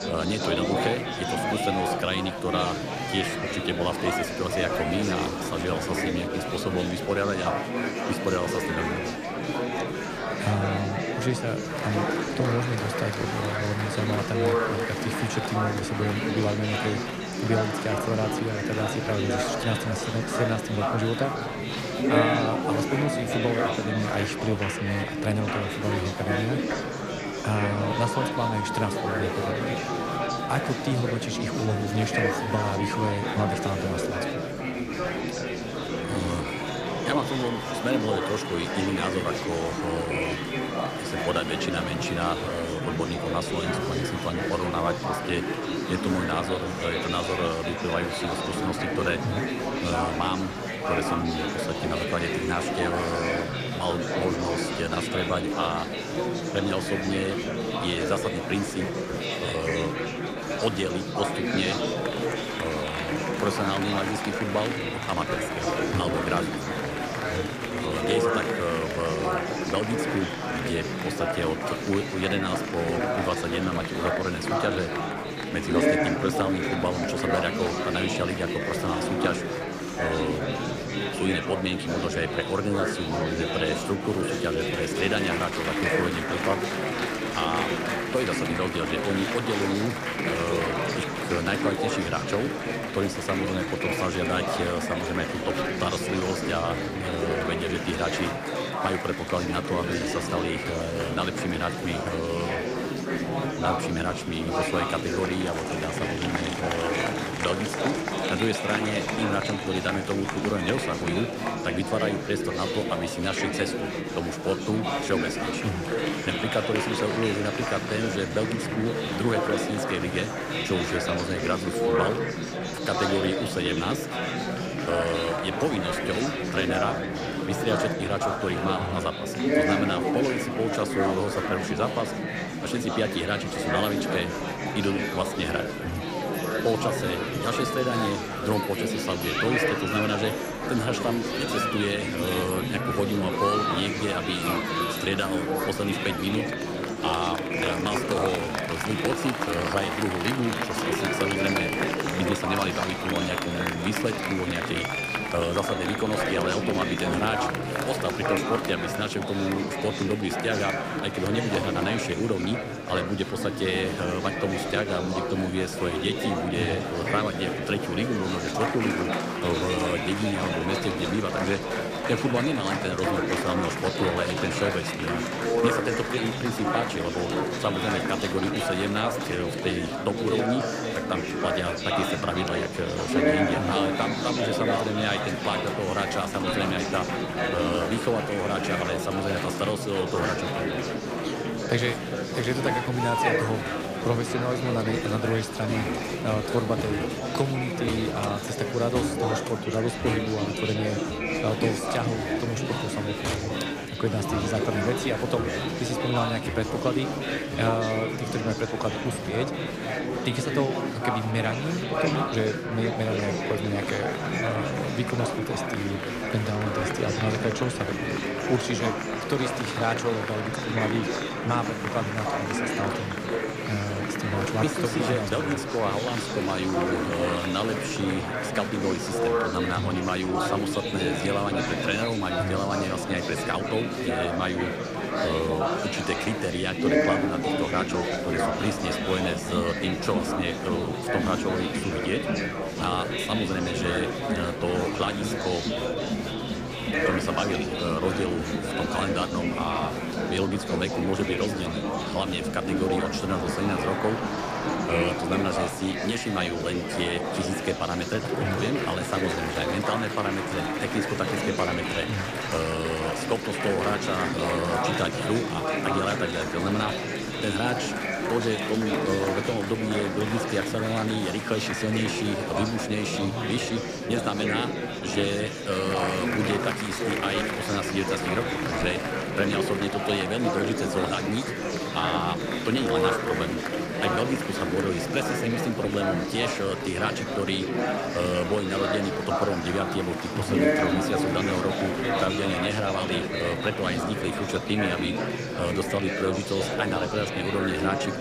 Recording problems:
murmuring crowd; very loud; throughout; 1 dB above the speech

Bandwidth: 15 kHz